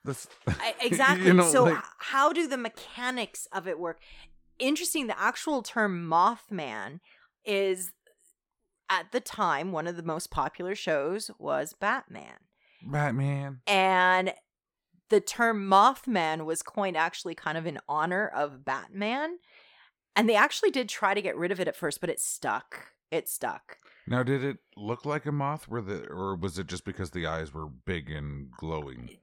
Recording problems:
none

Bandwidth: 17.5 kHz